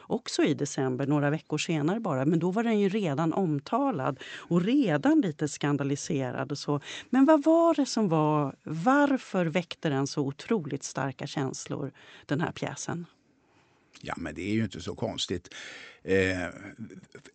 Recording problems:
high frequencies cut off; noticeable; nothing above 8 kHz

